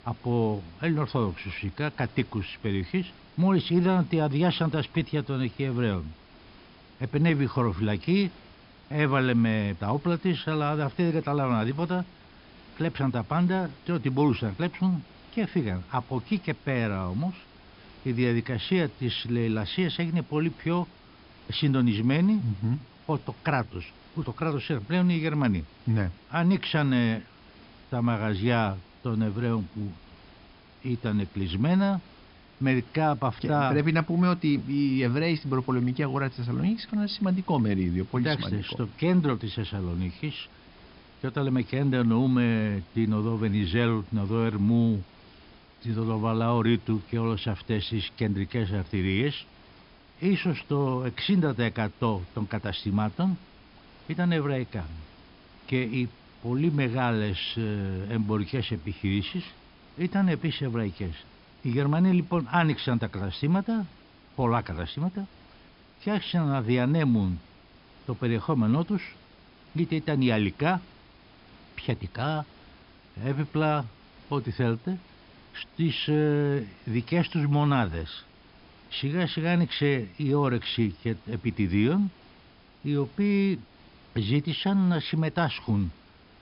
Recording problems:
high frequencies cut off; noticeable; nothing above 5.5 kHz
hiss; faint; throughout; 25 dB below the speech

